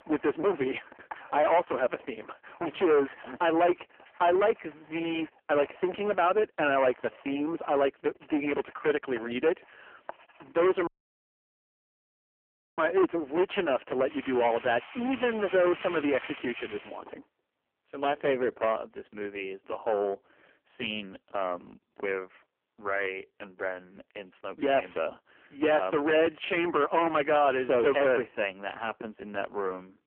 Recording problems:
phone-call audio; poor line; nothing above 3 kHz
distortion; heavy; 12% of the sound clipped
household noises; noticeable; until 17 s; 20 dB below the speech
audio cutting out; at 11 s for 2 s

